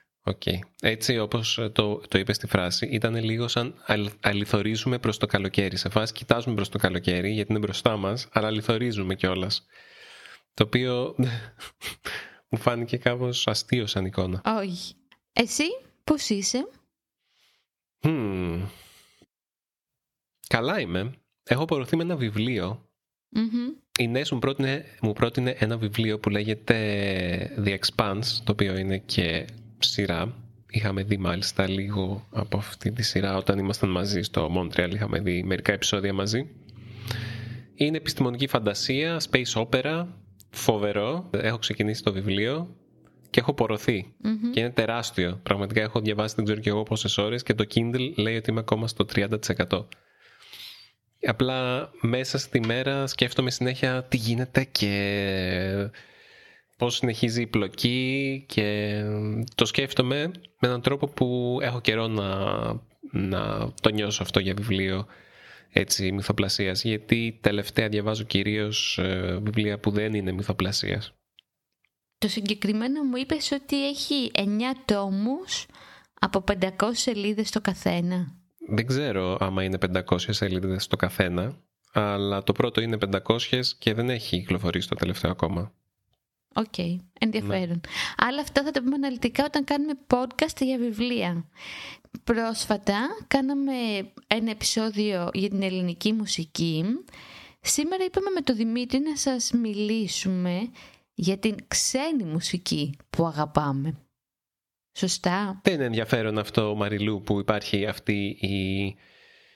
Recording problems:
squashed, flat; somewhat

